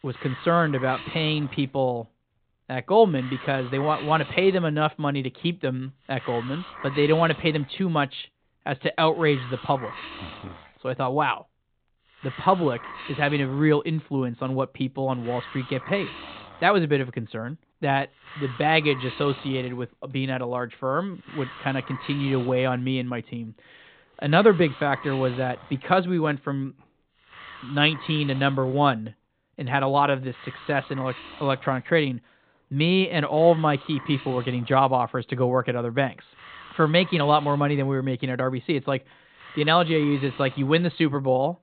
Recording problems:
high frequencies cut off; severe; nothing above 4 kHz
hiss; noticeable; throughout; 15 dB below the speech

